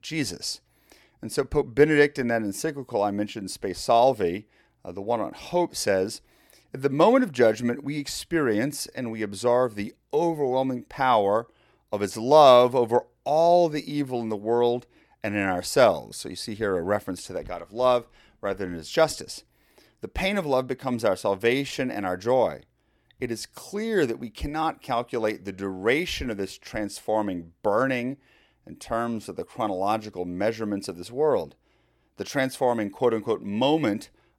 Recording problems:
none

